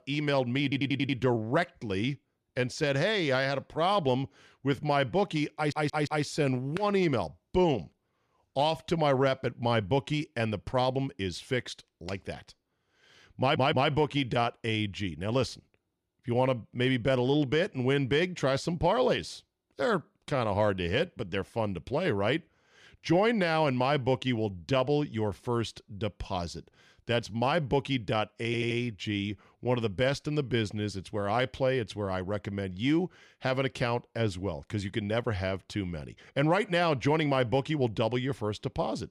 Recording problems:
audio stuttering; 4 times, first at 0.5 s

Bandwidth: 14.5 kHz